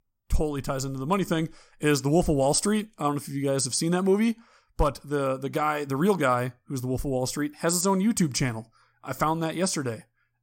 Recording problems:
none

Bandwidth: 16 kHz